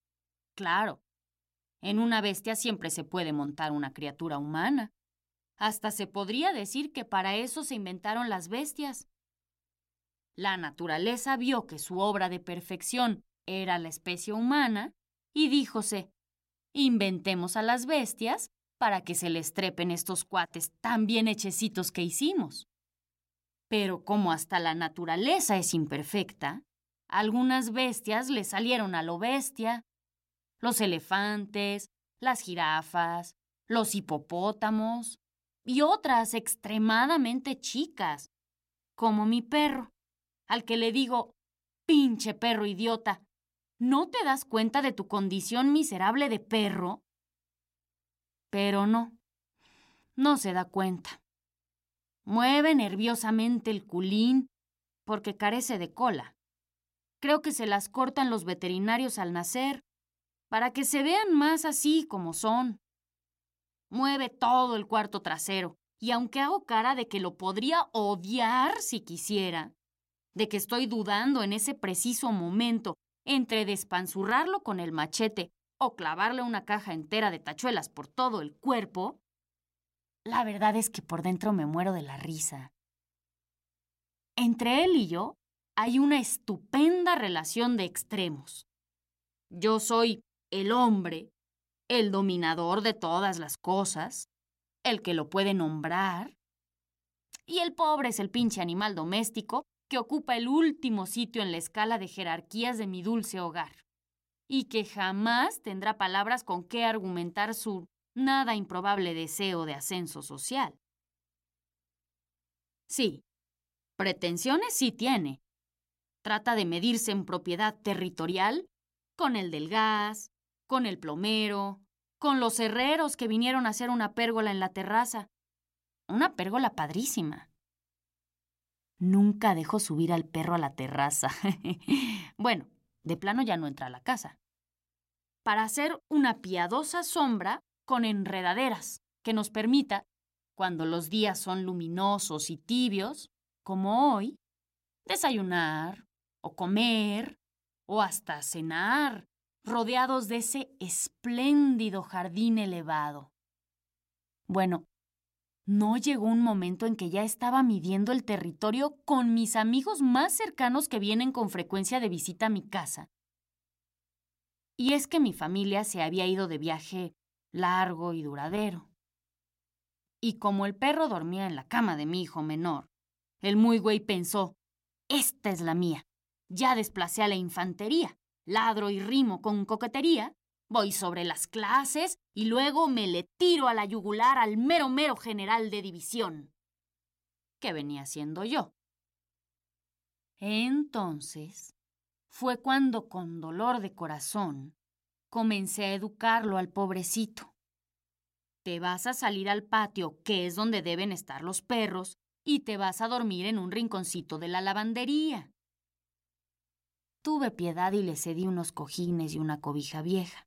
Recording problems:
none

